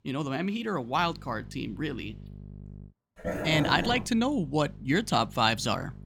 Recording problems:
electrical hum; faint; from 1 to 3 s and from 4 s on; 50 Hz, 30 dB below the speech
dog barking; noticeable; at 3 s; peak 4 dB below the speech

